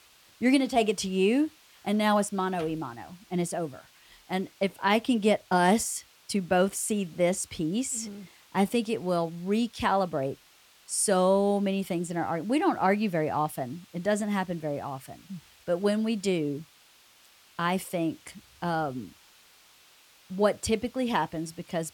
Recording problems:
hiss; faint; throughout; 30 dB below the speech

